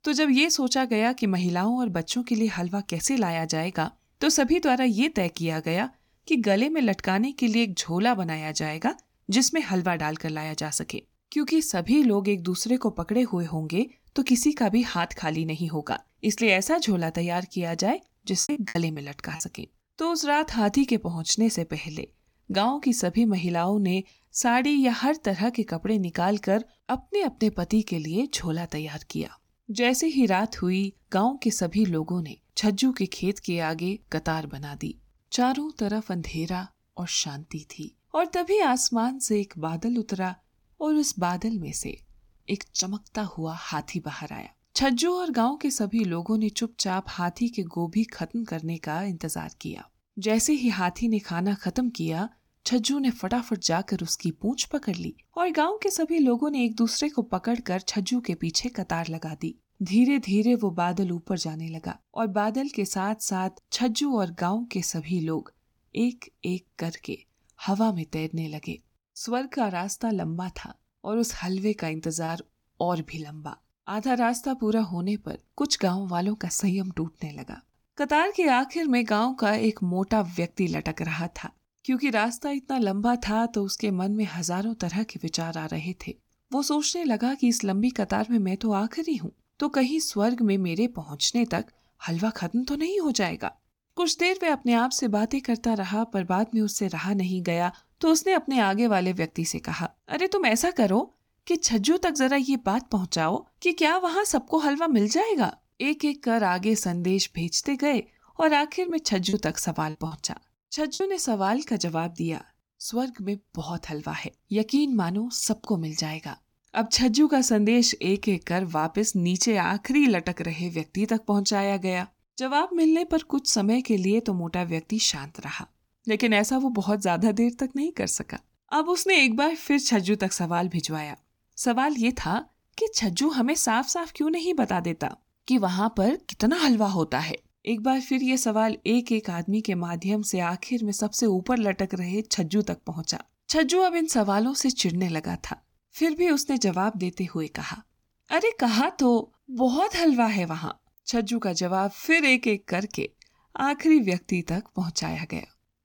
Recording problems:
choppy; very; at 18 s, at 1:12 and from 1:49 to 1:51; 11% of the speech affected

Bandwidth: 18 kHz